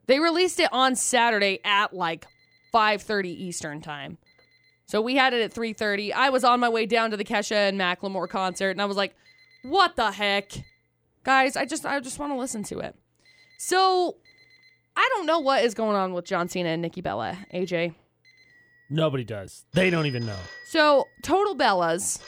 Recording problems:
alarms or sirens; faint; throughout; 25 dB below the speech

